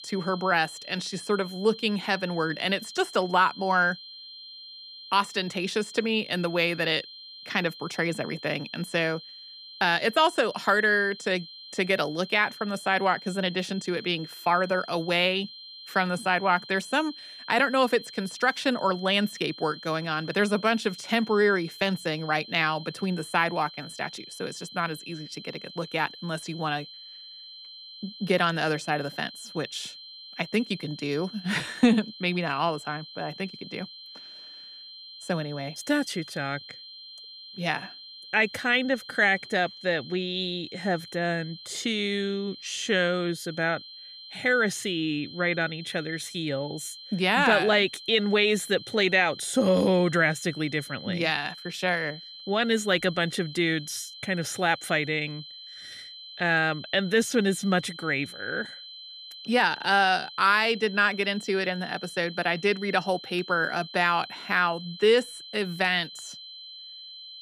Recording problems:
high-pitched whine; noticeable; throughout; 4 kHz, 15 dB below the speech

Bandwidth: 14.5 kHz